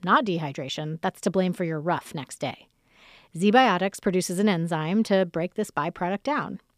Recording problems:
none

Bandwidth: 15 kHz